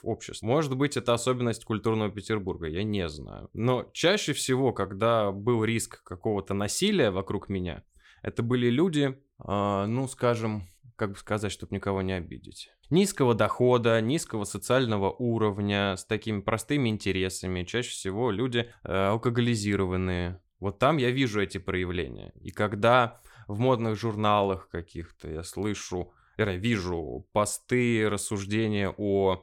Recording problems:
none

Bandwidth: 17 kHz